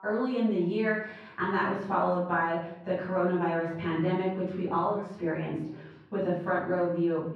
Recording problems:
off-mic speech; far
room echo; noticeable; dies away in 0.6 s
muffled; slightly; fading above 2 kHz
voice in the background; faint; throughout; 25 dB below the speech

